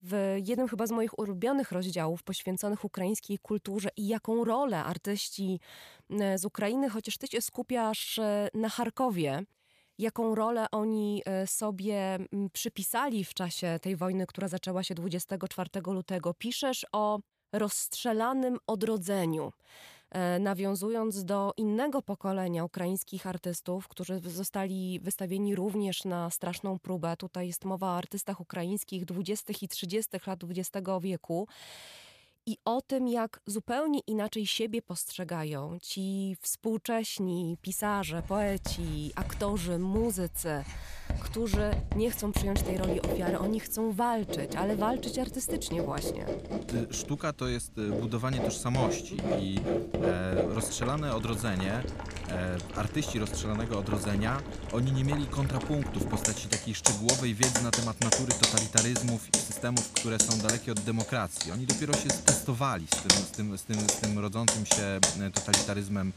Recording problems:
household noises; very loud; from 38 s on; 2 dB above the speech

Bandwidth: 14.5 kHz